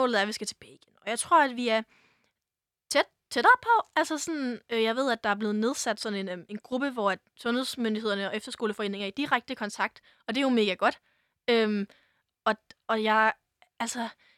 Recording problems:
abrupt cut into speech; at the start

